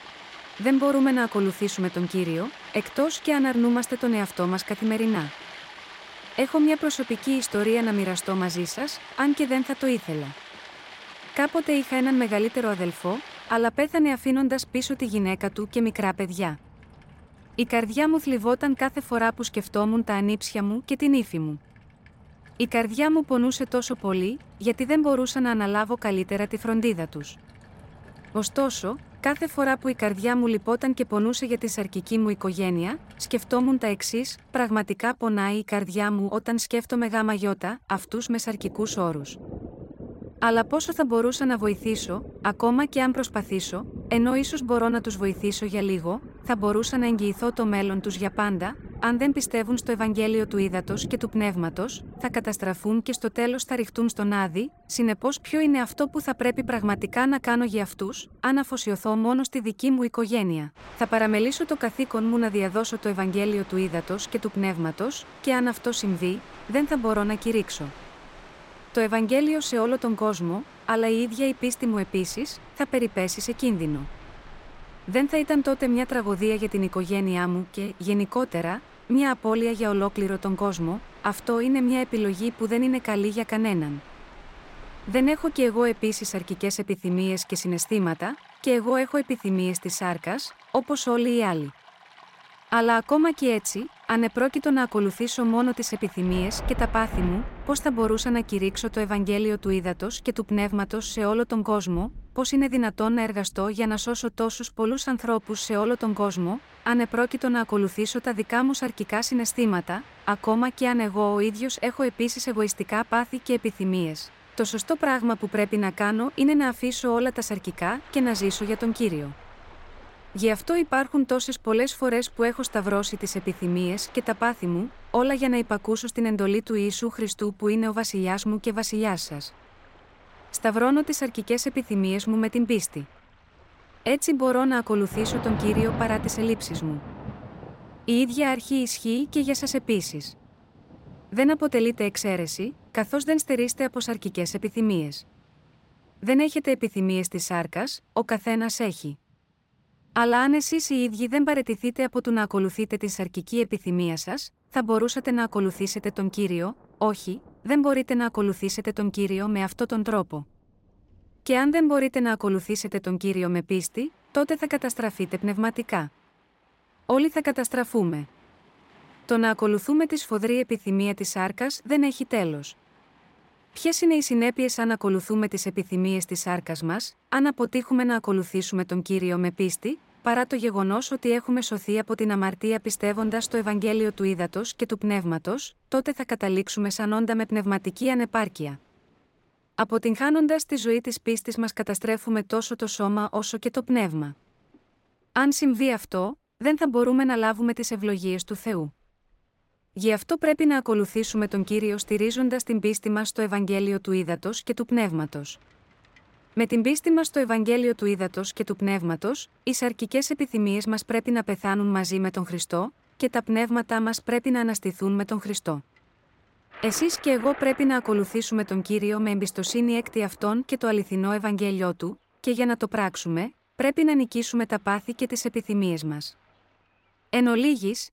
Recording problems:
rain or running water; noticeable; throughout; 20 dB below the speech

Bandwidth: 16 kHz